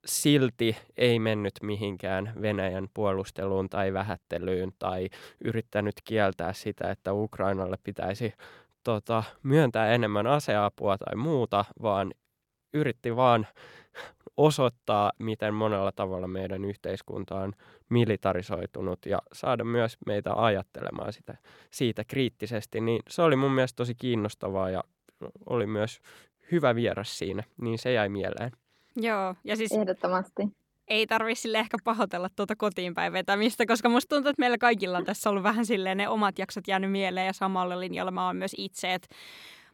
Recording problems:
none

